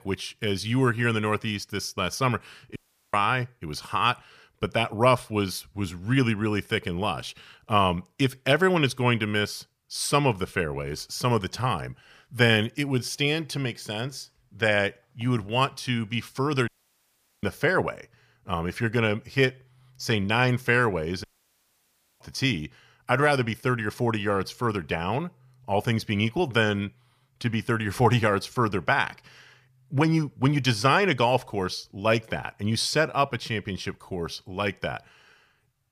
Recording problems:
audio cutting out; at 3 s, at 17 s for 1 s and at 21 s for 1 s

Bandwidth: 15 kHz